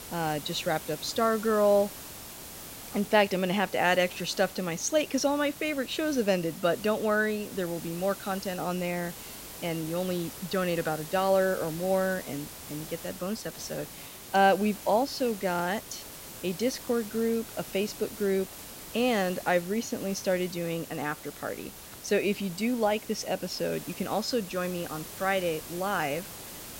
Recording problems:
hiss; noticeable; throughout; 10 dB below the speech

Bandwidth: 16 kHz